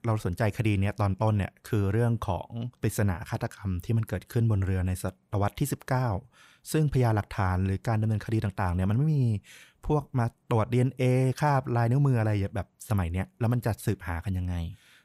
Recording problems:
none

